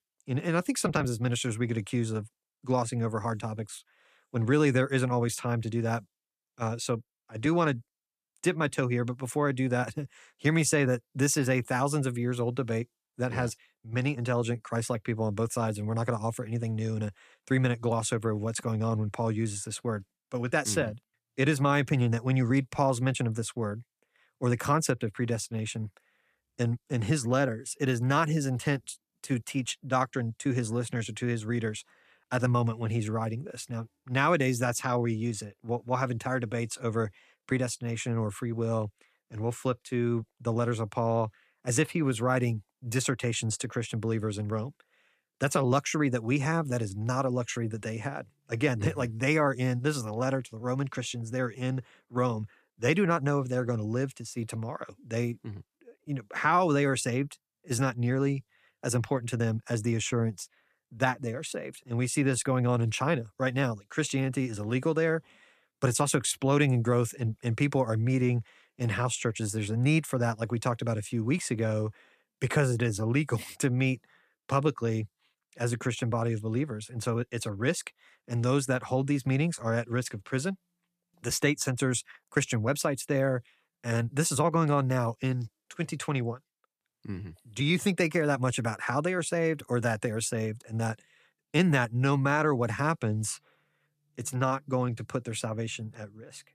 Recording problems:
none

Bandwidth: 14.5 kHz